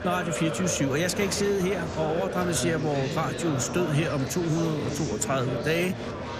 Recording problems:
chatter from many people; loud; throughout; 5 dB below the speech

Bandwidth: 14.5 kHz